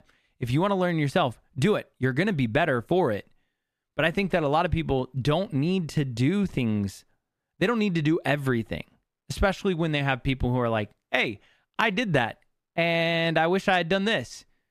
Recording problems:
none

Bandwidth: 14.5 kHz